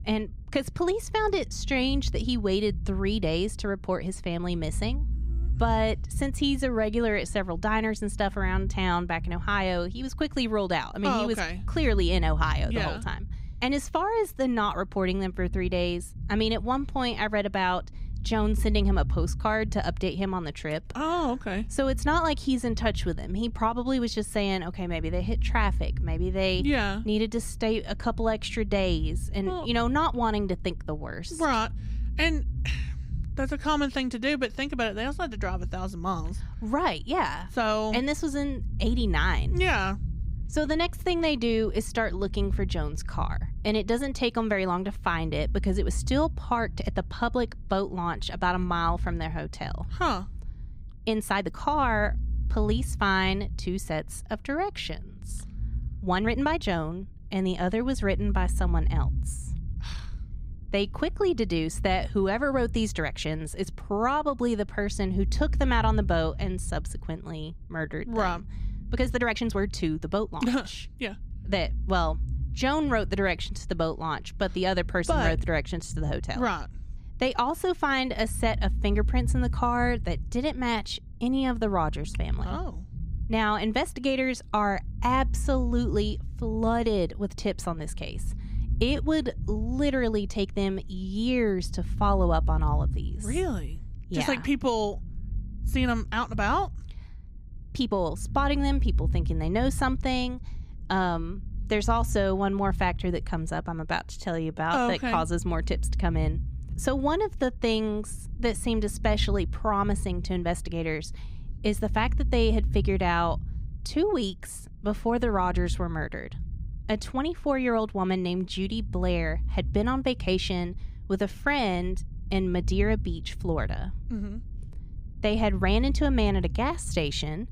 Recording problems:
low rumble; faint; throughout; 25 dB below the speech
uneven, jittery; strongly; from 51 s to 2:03

